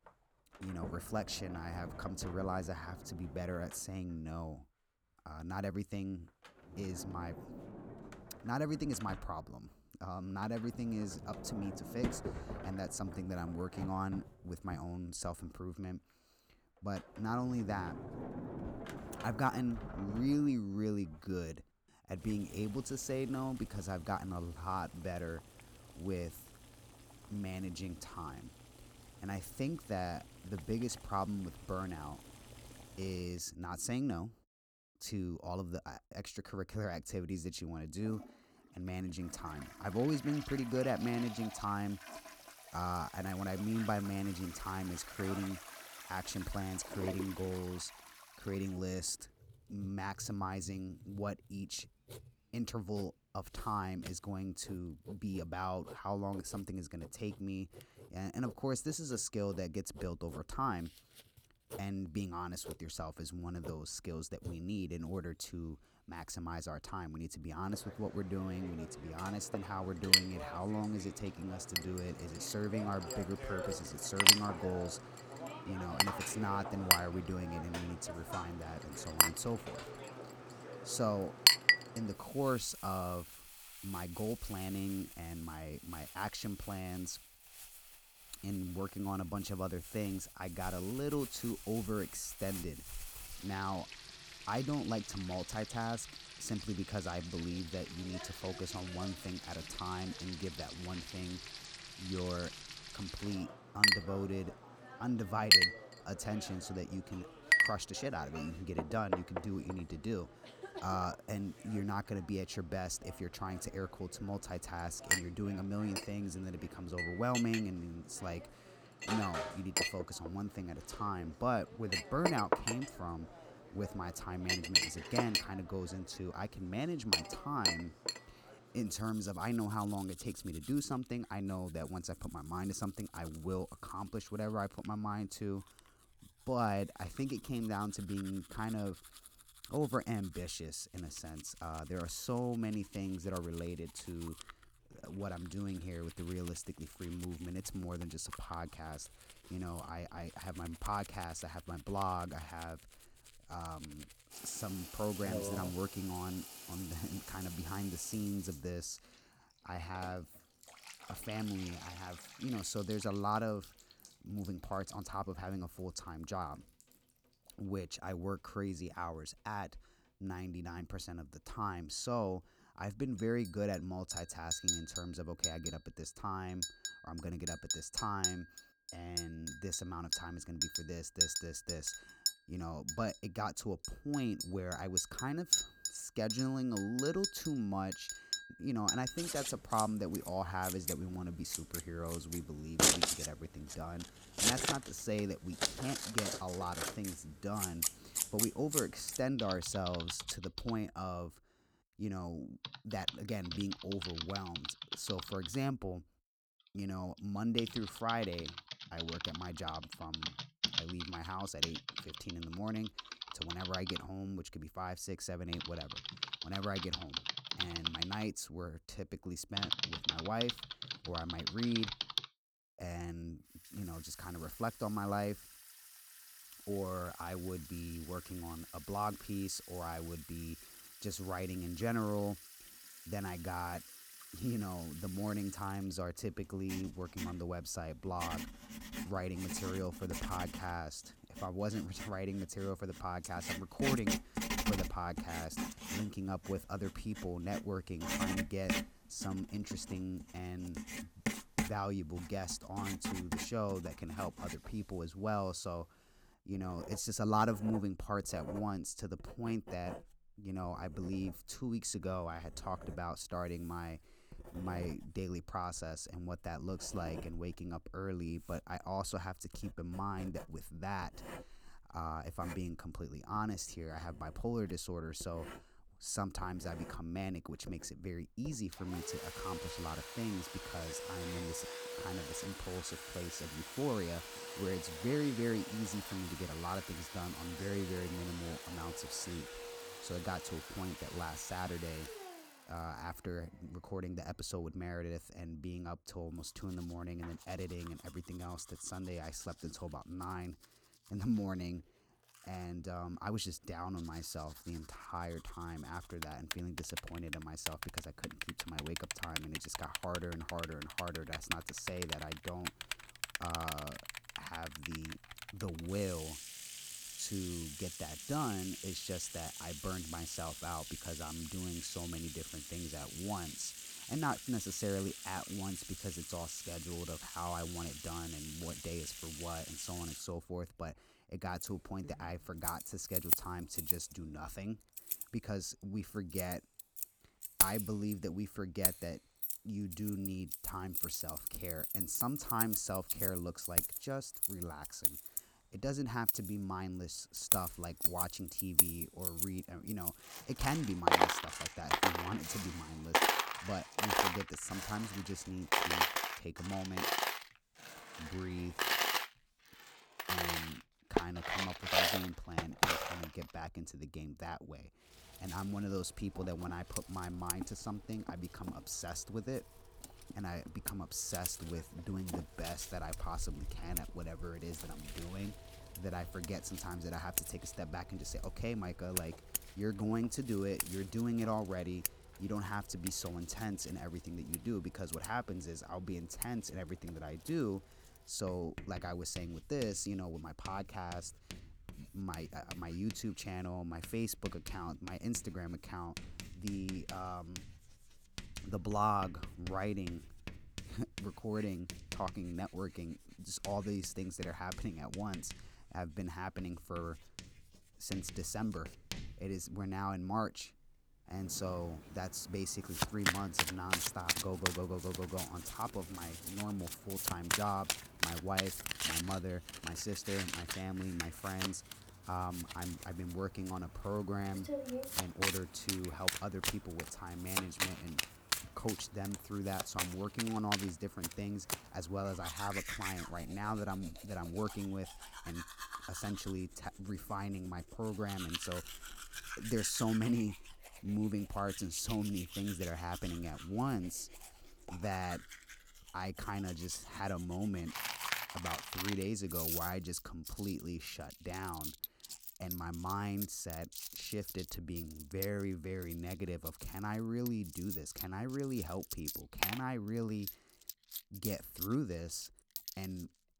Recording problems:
household noises; very loud; throughout; 2 dB above the speech

